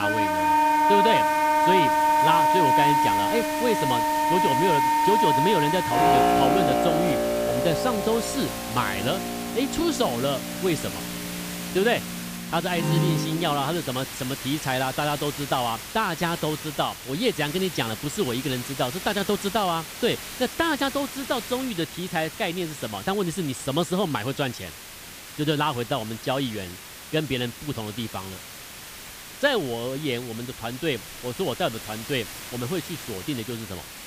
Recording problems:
background music; very loud; until 13 s; 5 dB above the speech
hiss; loud; throughout; 8 dB below the speech
abrupt cut into speech; at the start

